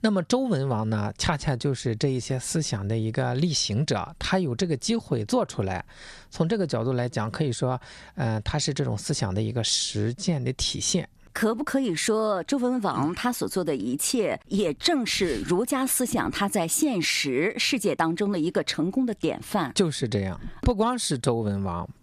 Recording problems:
squashed, flat; somewhat

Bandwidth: 14.5 kHz